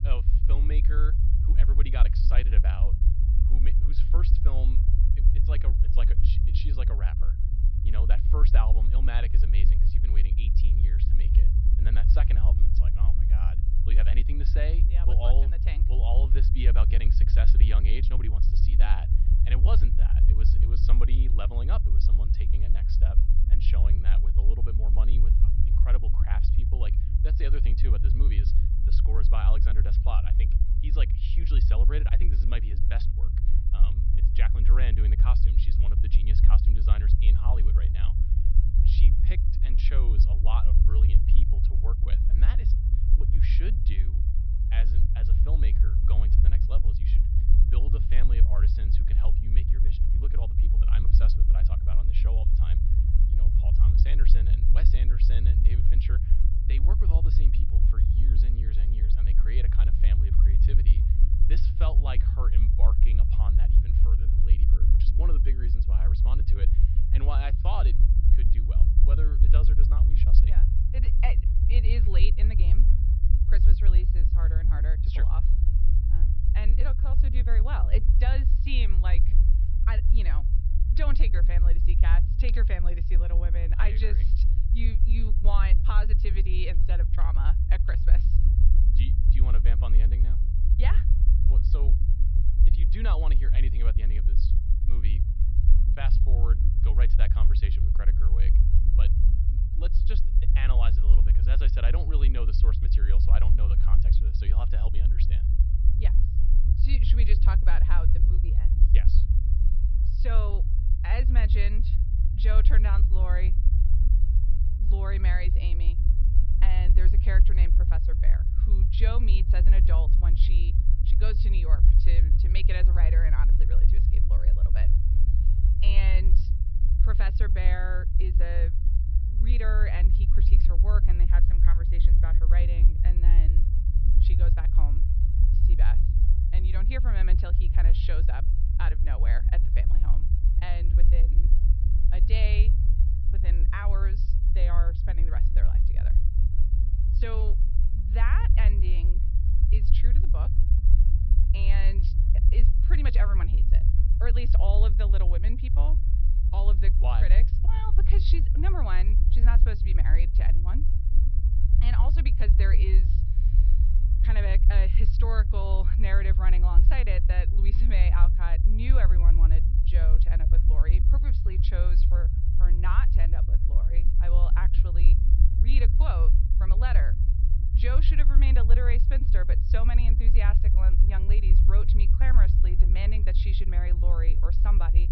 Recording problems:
high frequencies cut off; noticeable; nothing above 5.5 kHz
low rumble; loud; throughout; 4 dB below the speech

